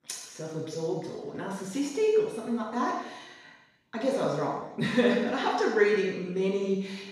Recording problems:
room echo; strong; dies away in 1 s
off-mic speech; far

